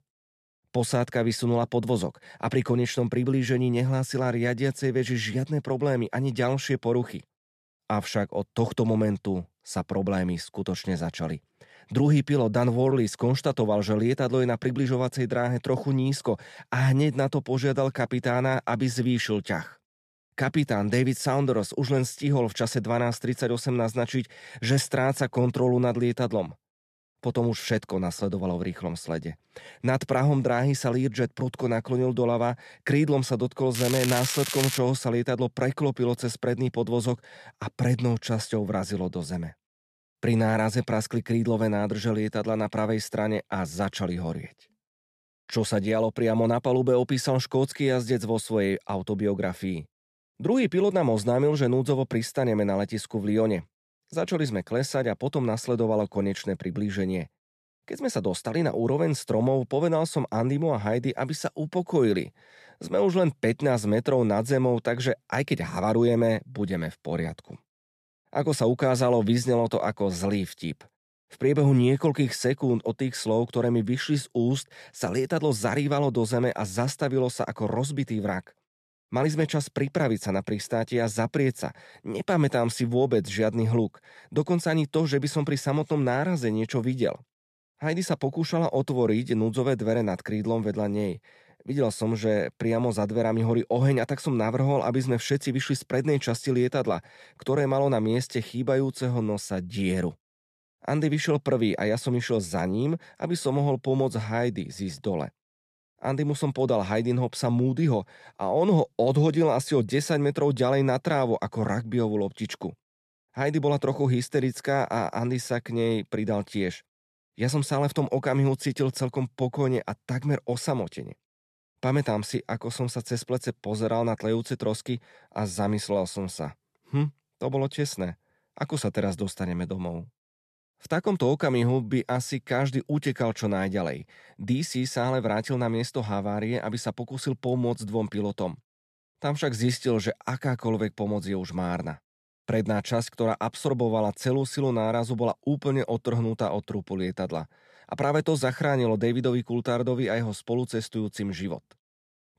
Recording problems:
crackling; loud; from 34 to 35 s; 4 dB below the speech

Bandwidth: 13.5 kHz